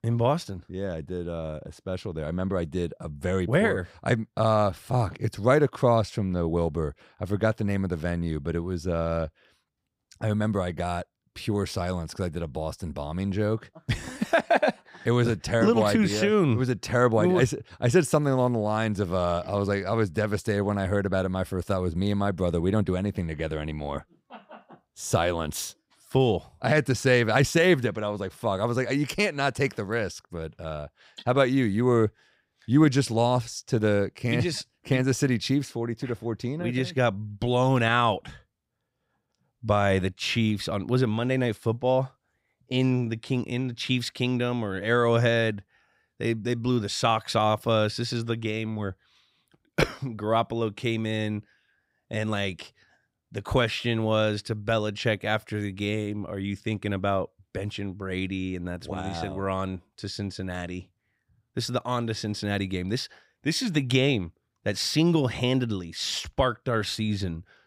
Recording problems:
none

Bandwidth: 15.5 kHz